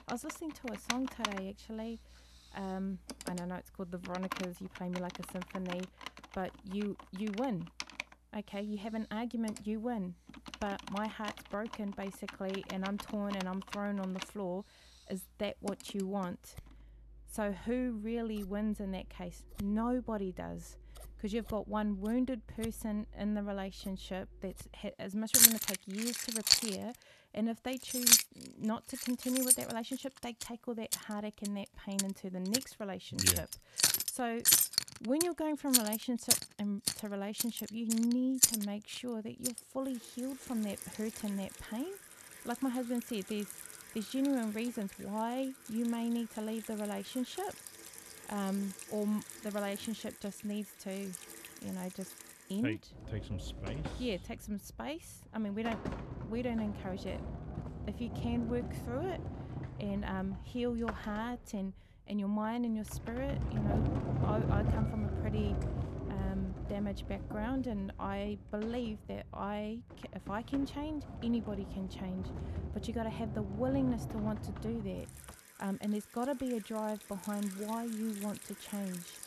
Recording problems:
household noises; very loud; throughout; 4 dB above the speech

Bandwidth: 13.5 kHz